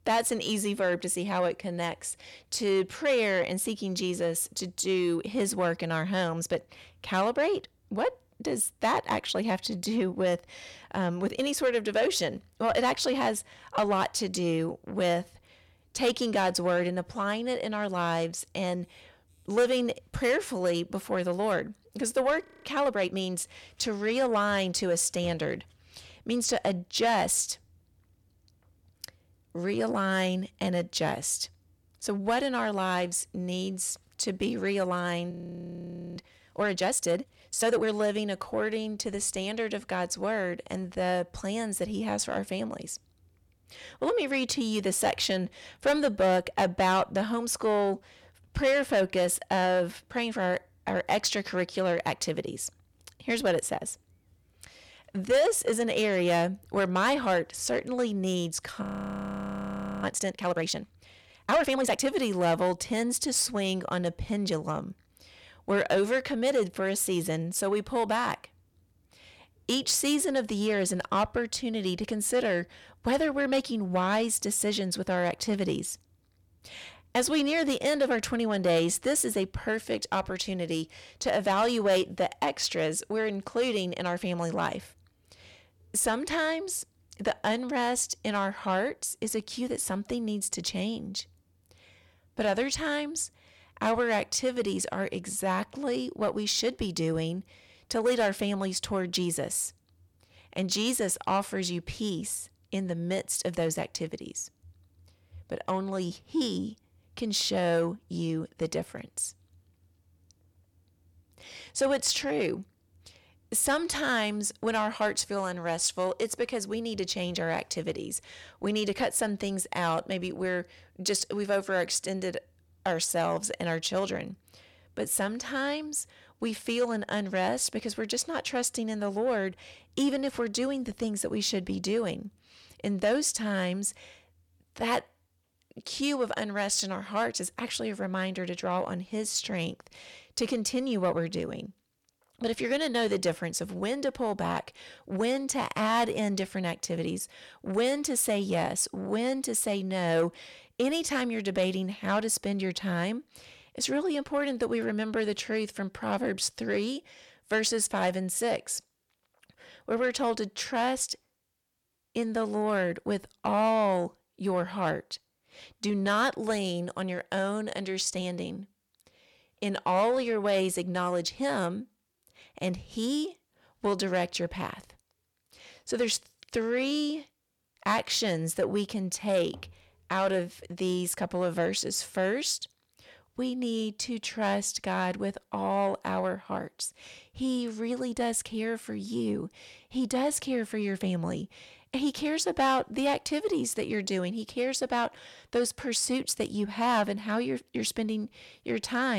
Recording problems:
distortion; slight; 10 dB below the speech
audio freezing; at 22 s, at 35 s for 1 s and at 59 s for 1 s
abrupt cut into speech; at the end

